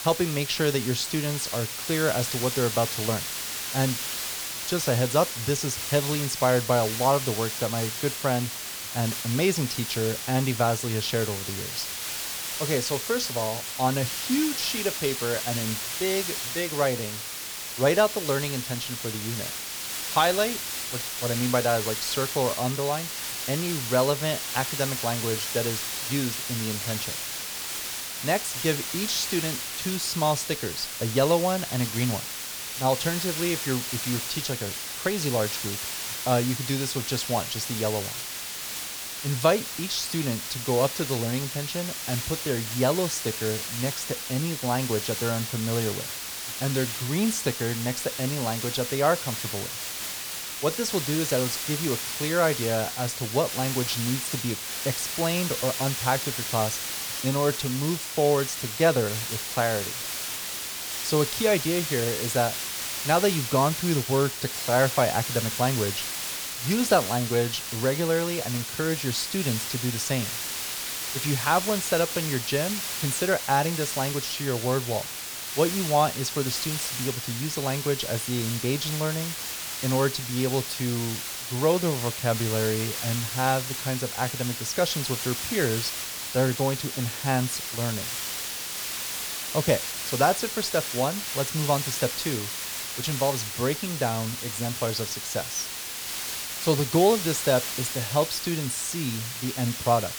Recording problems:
hiss; loud; throughout; 3 dB below the speech

